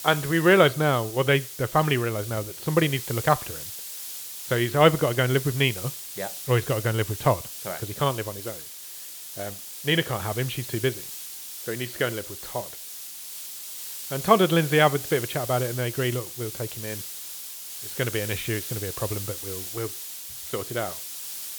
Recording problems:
high frequencies cut off; severe; nothing above 4.5 kHz
hiss; loud; throughout; 9 dB below the speech

